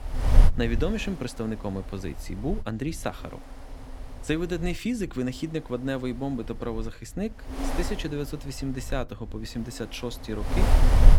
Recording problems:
wind noise on the microphone; heavy; 5 dB below the speech

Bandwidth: 17 kHz